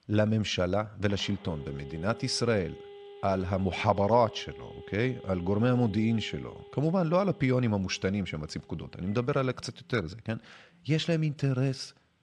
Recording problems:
alarms or sirens; noticeable; throughout; 20 dB below the speech

